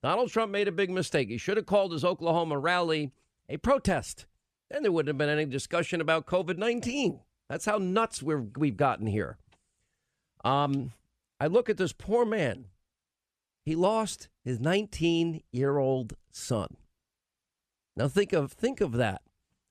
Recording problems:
none

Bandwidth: 13.5 kHz